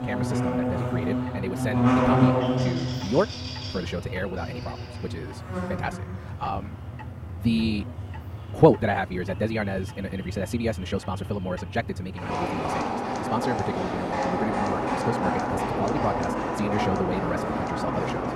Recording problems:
wrong speed, natural pitch; too fast; 1.6 times normal speed
muffled; slightly; fading above 2.5 kHz
animal sounds; very loud; throughout; 1 dB above the speech
household noises; faint; throughout; 20 dB below the speech
traffic noise; faint; throughout; 20 dB below the speech

